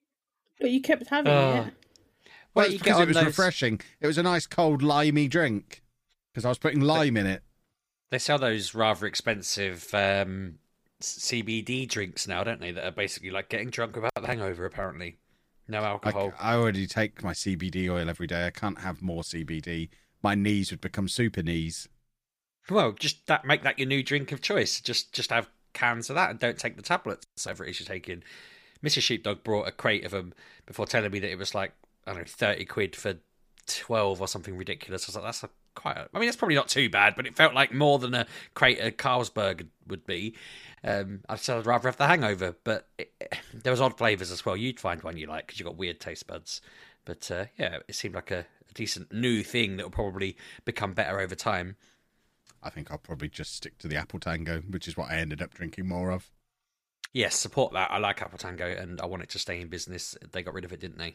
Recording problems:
none

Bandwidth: 15 kHz